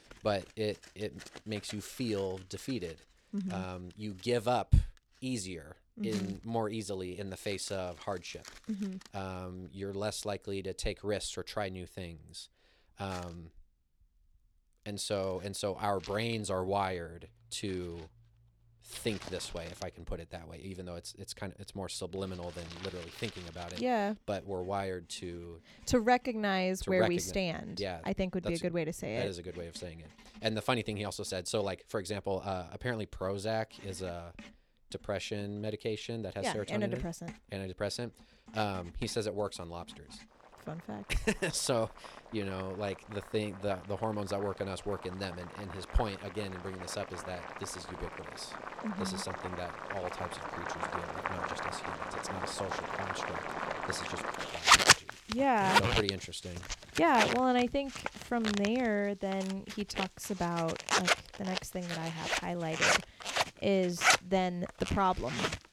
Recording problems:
household noises; very loud; throughout; 2 dB above the speech

